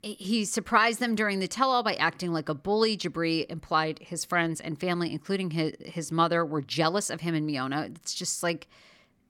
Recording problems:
none

